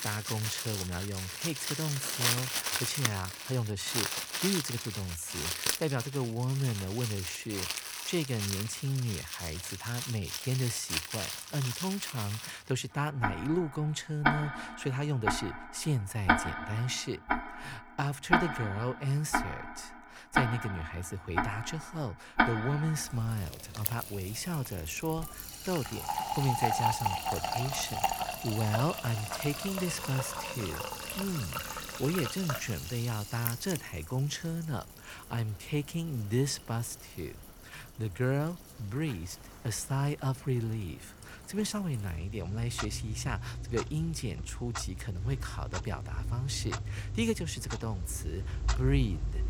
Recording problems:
household noises; loud; throughout; as loud as the speech

